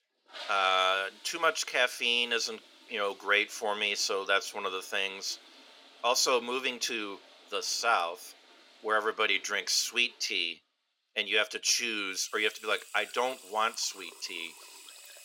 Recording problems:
thin; somewhat; fading below 500 Hz
household noises; faint; throughout; 20 dB below the speech

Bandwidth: 16 kHz